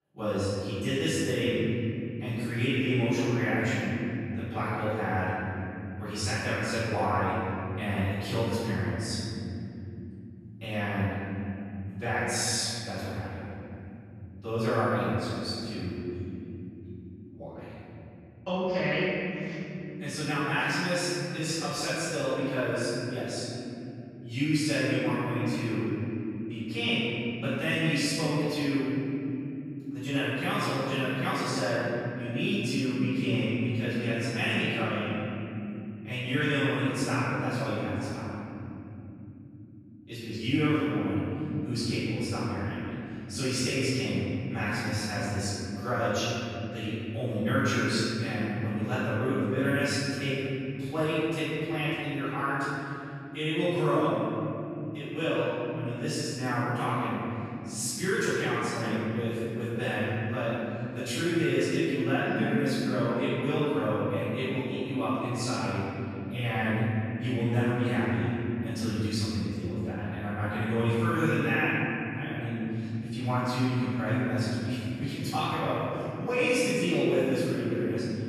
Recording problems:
room echo; strong; dies away in 3 s
off-mic speech; far

